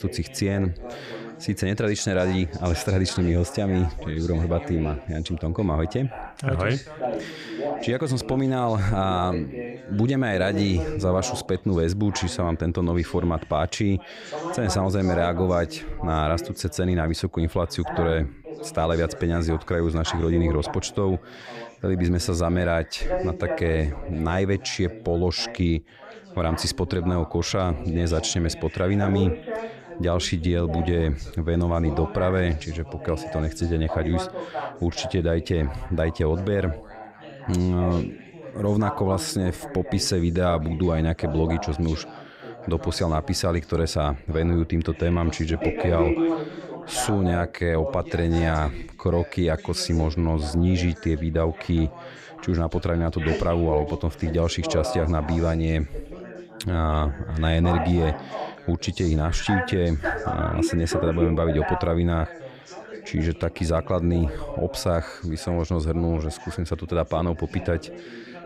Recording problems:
background chatter; loud; throughout; 3 voices, 10 dB below the speech

